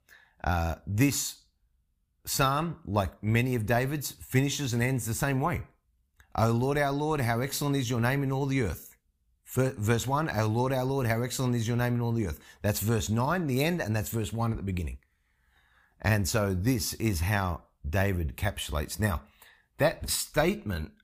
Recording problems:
none

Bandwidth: 15 kHz